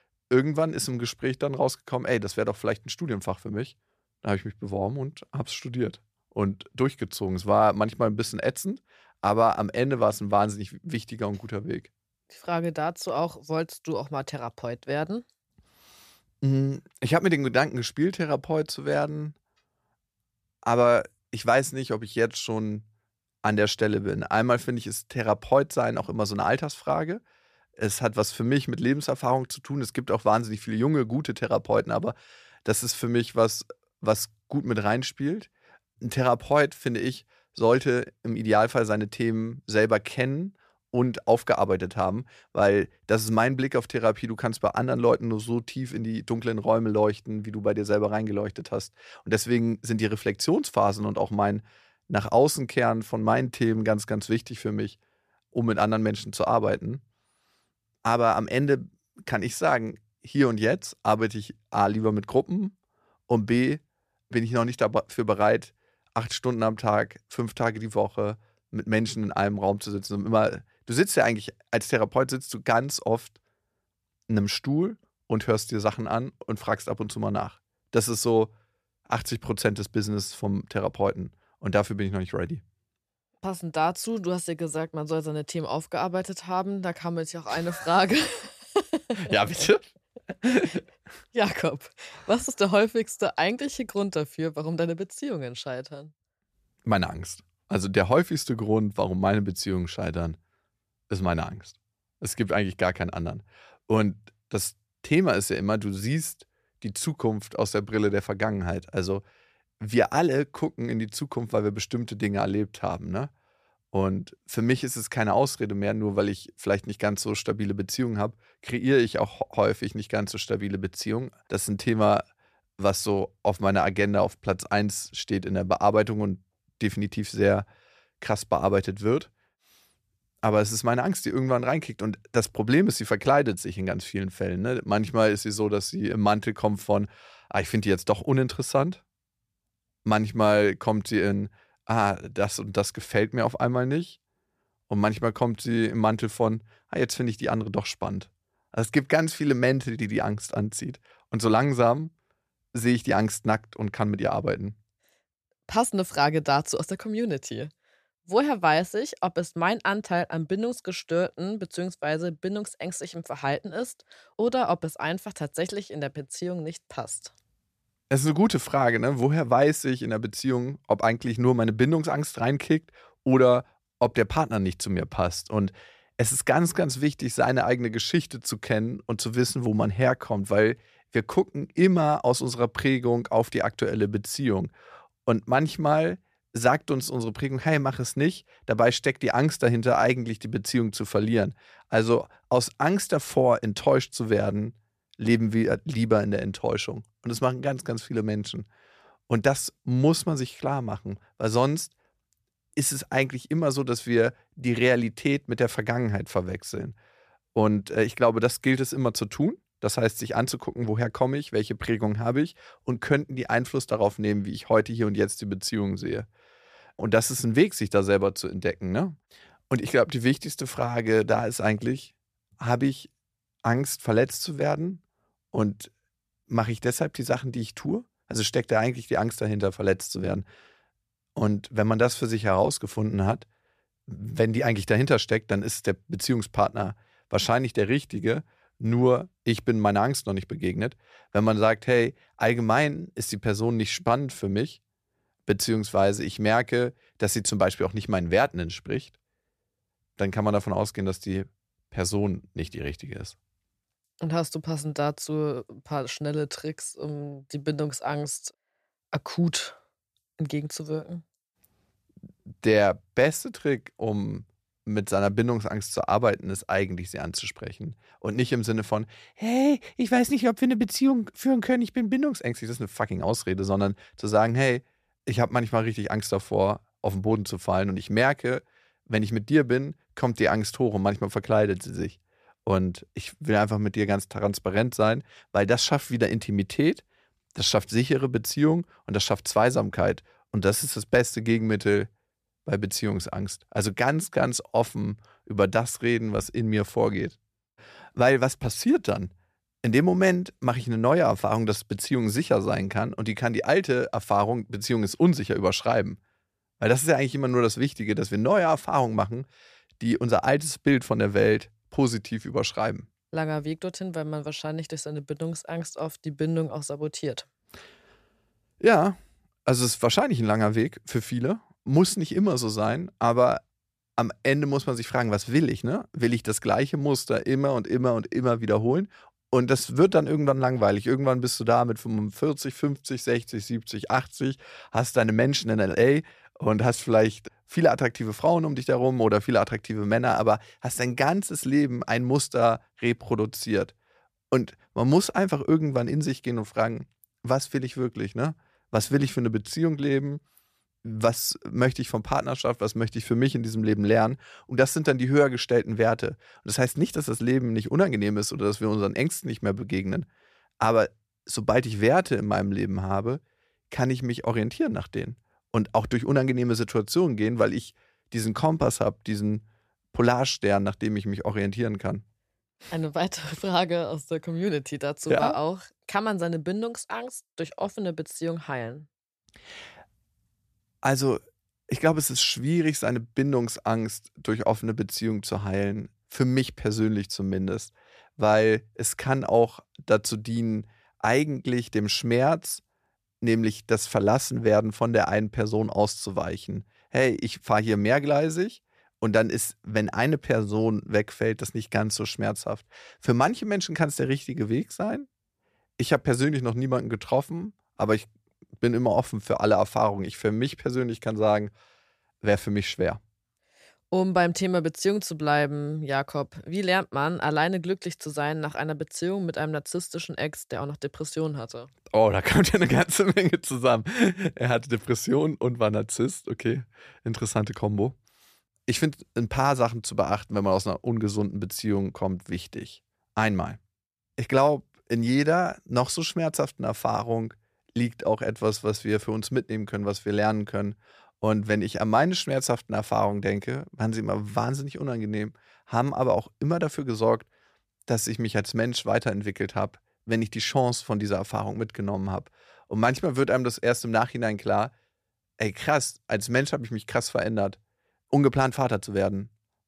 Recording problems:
none

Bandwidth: 14.5 kHz